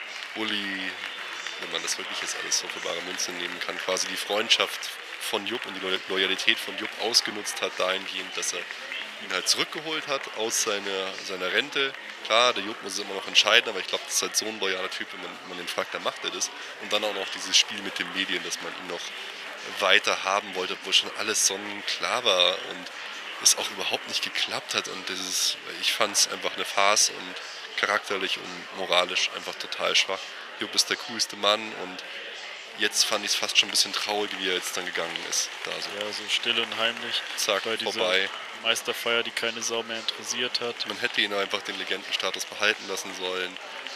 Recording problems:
thin; very; fading below 750 Hz
murmuring crowd; noticeable; throughout; 10 dB below the speech

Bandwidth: 14.5 kHz